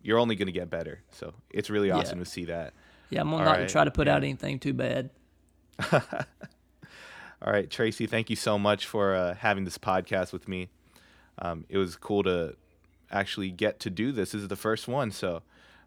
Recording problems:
none

